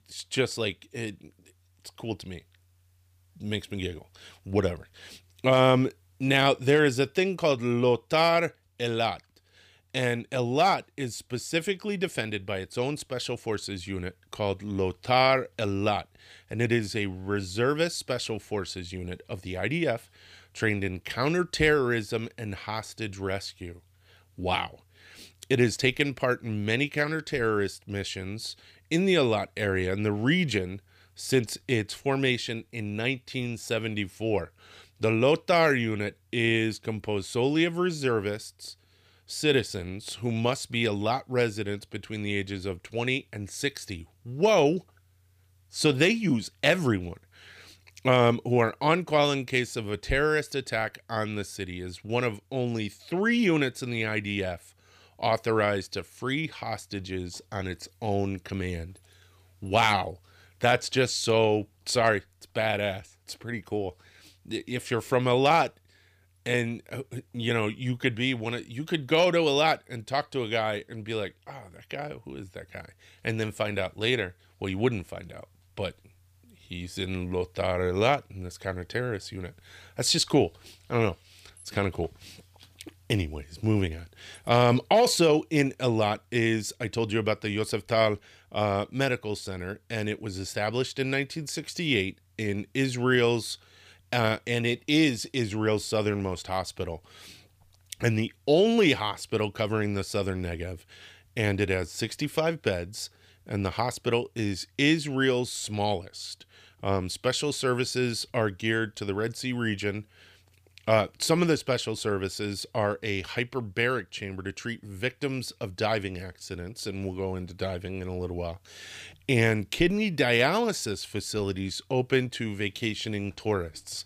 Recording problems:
none

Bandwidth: 15 kHz